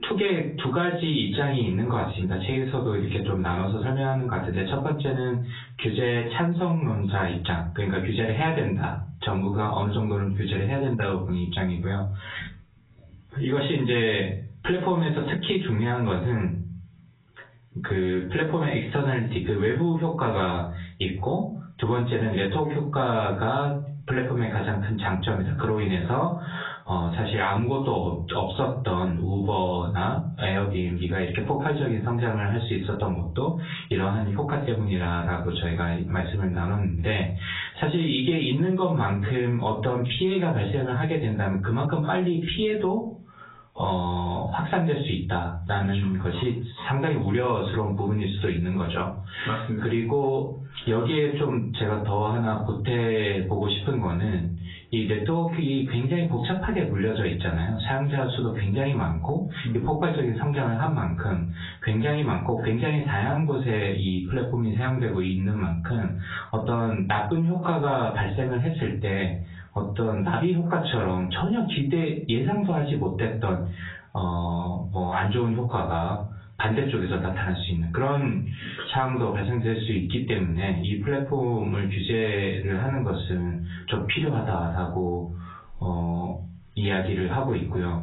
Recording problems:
off-mic speech; far
garbled, watery; badly; nothing above 4 kHz
squashed, flat; heavily
room echo; very slight; dies away in 0.3 s

